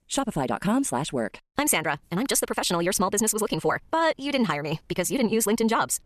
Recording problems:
wrong speed, natural pitch; too fast; 1.5 times normal speed

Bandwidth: 13.5 kHz